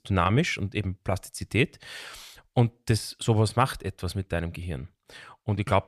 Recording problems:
none

